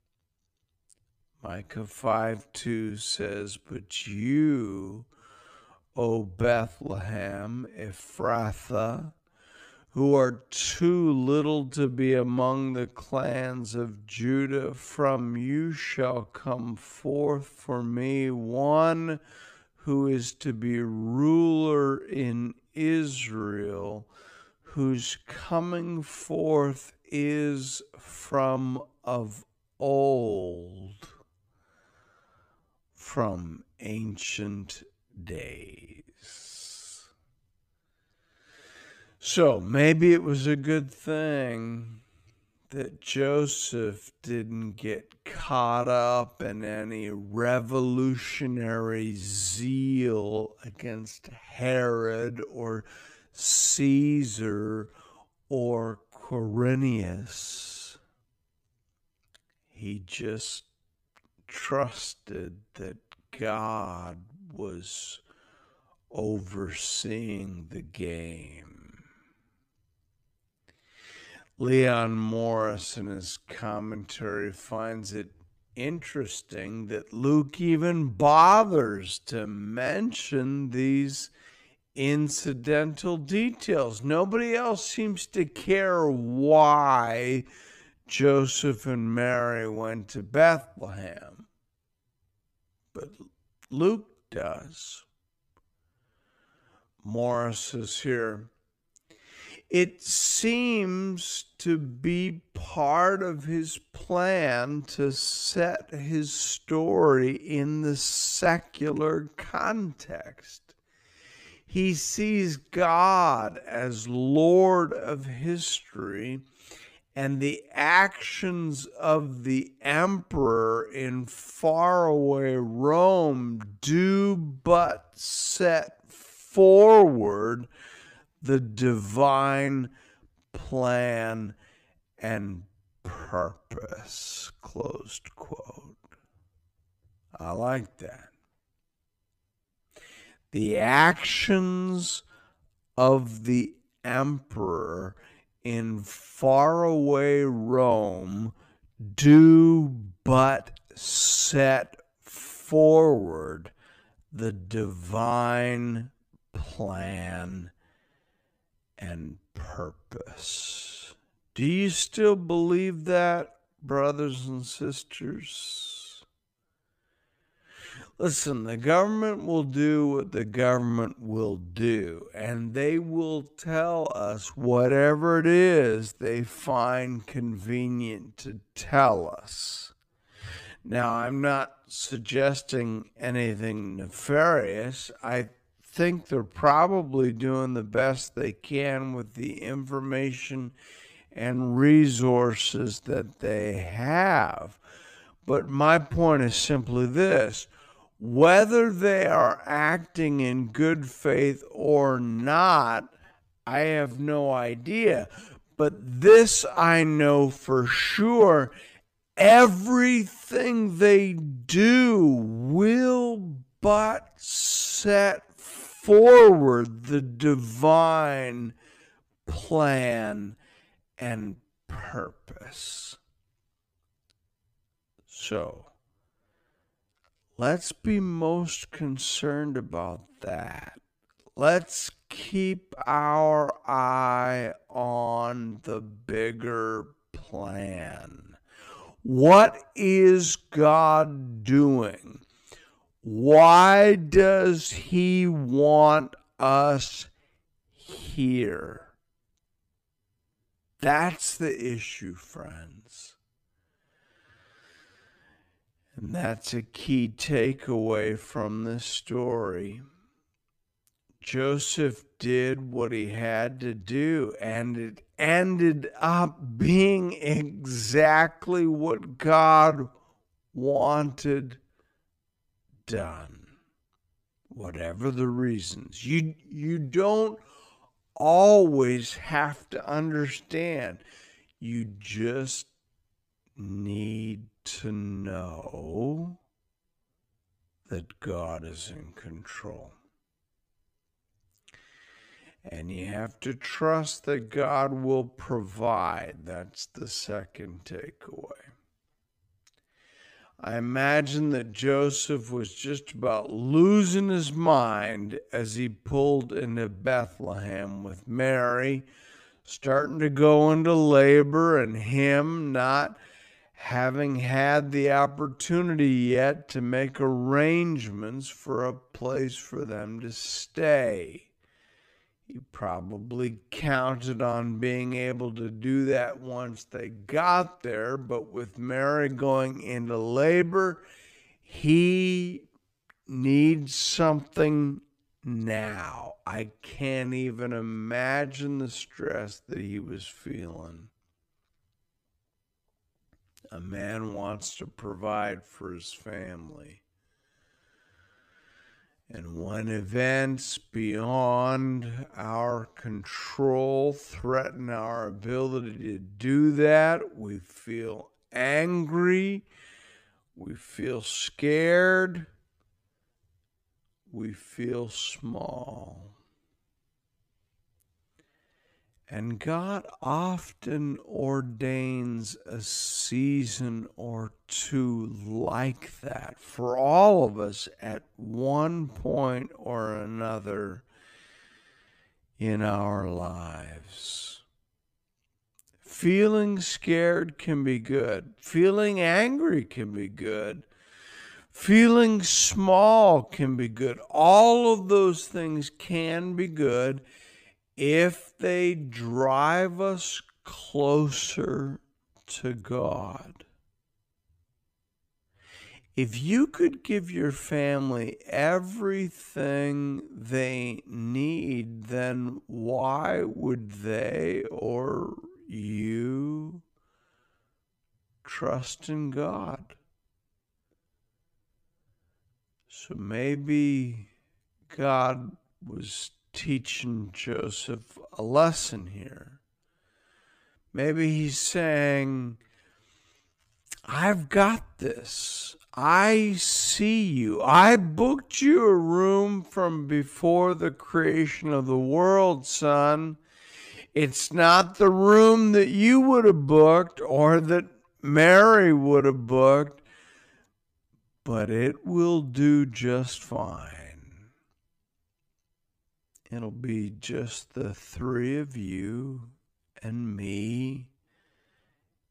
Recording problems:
wrong speed, natural pitch; too slow; 0.5 times normal speed

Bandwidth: 15 kHz